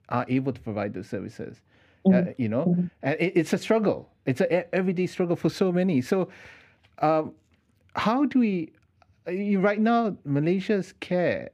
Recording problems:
muffled; very slightly; fading above 4 kHz

